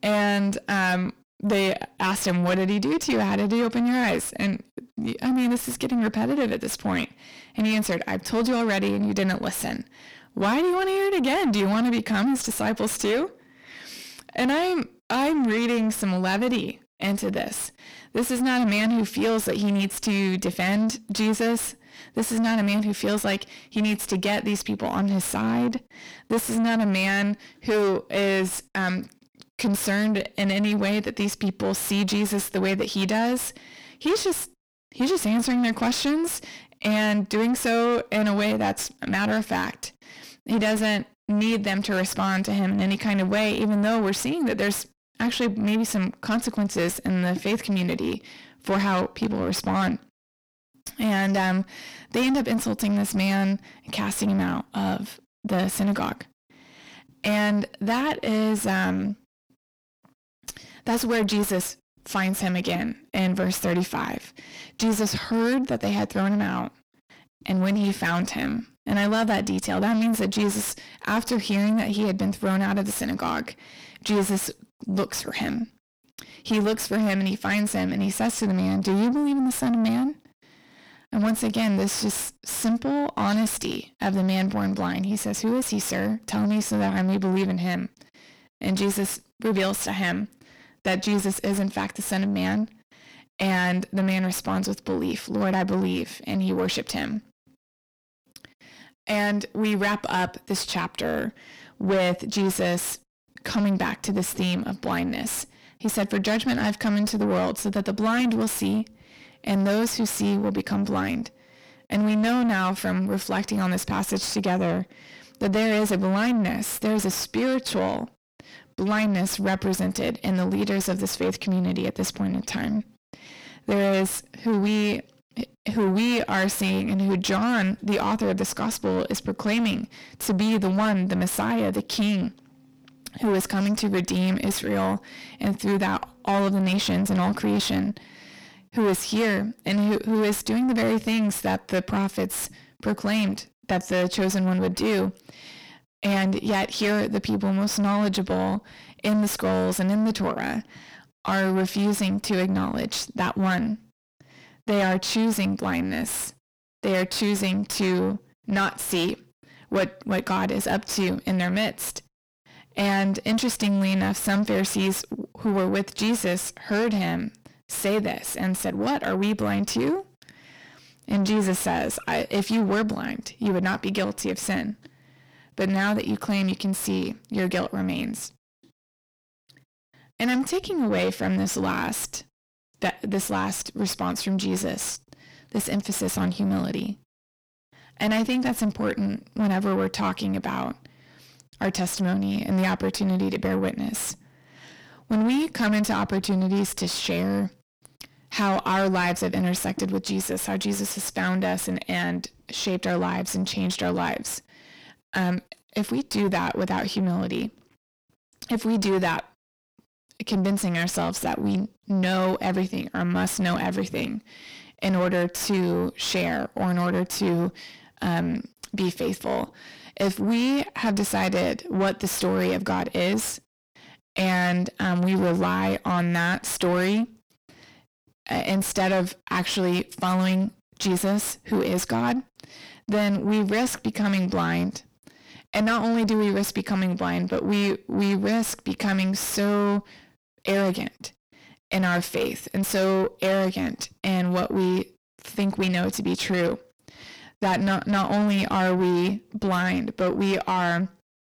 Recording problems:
distortion; heavy; 6 dB below the speech

